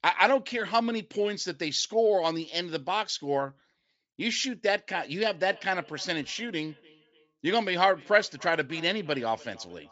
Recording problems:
high frequencies cut off; noticeable; nothing above 8 kHz
echo of what is said; faint; from 5 s on; 290 ms later, 25 dB below the speech

